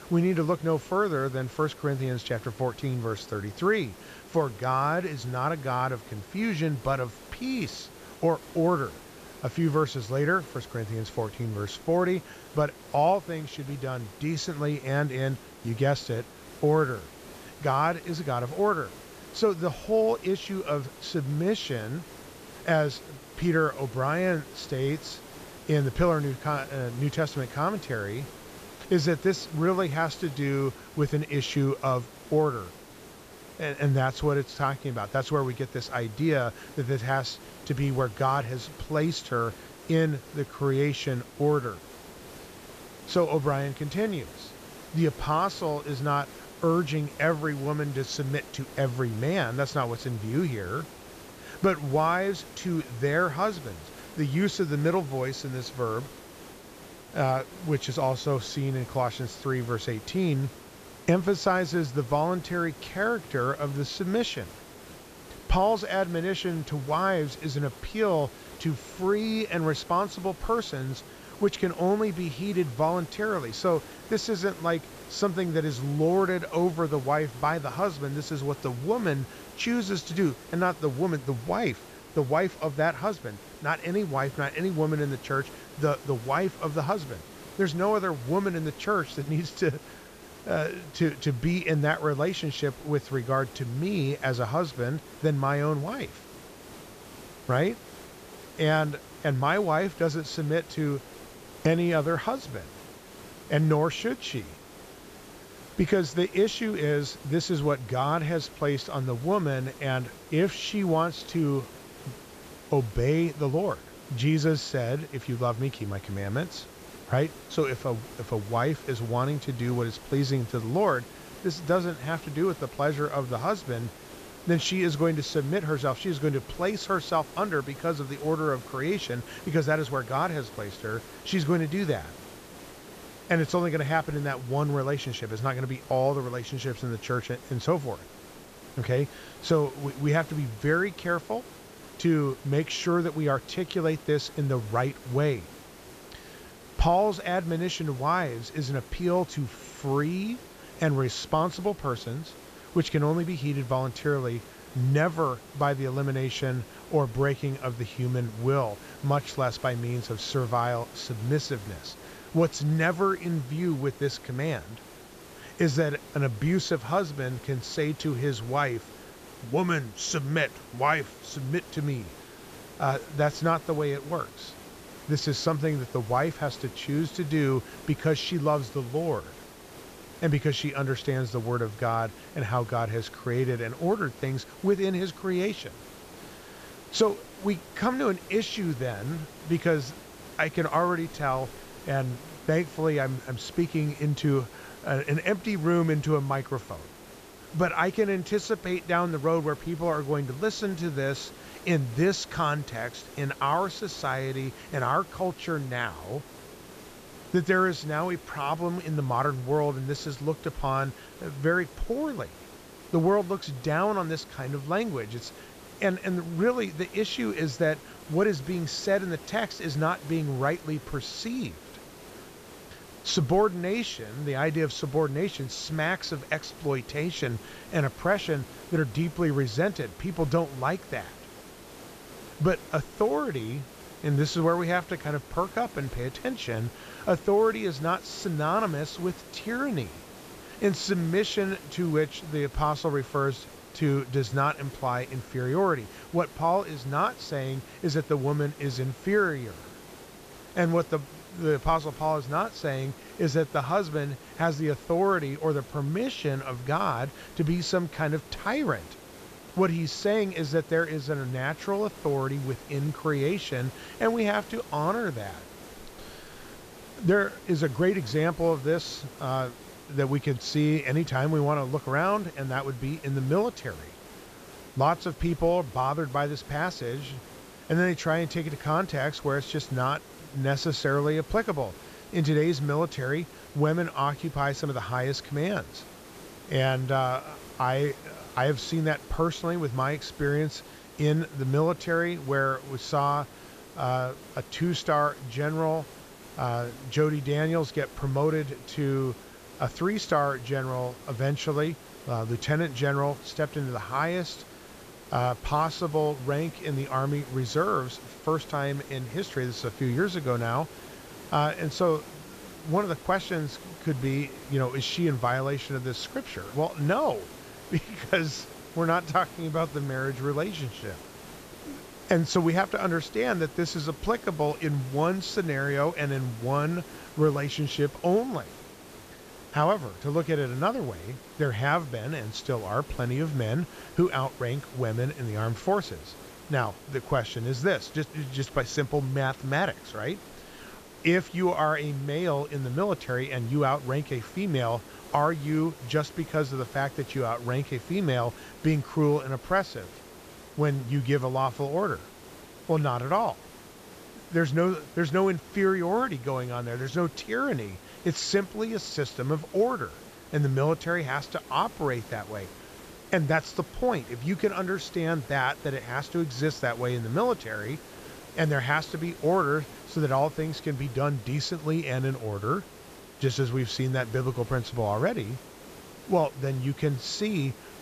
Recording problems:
high frequencies cut off; noticeable; nothing above 8 kHz
hiss; noticeable; throughout; 15 dB below the speech

